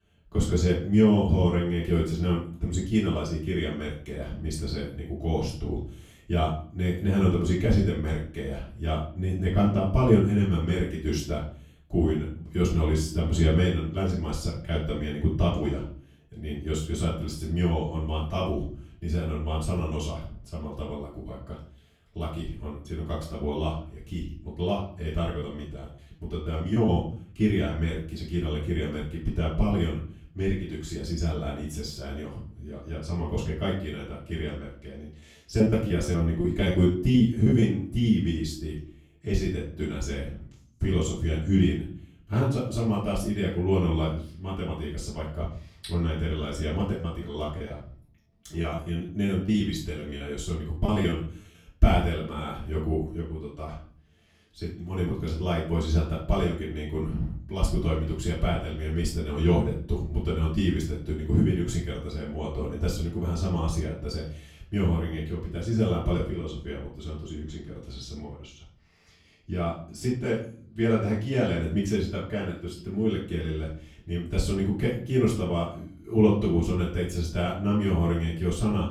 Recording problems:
off-mic speech; far
room echo; noticeable; dies away in 0.5 s
choppy; very; from 25 to 27 s, from 36 to 38 s and from 47 to 51 s; 17% of the speech affected

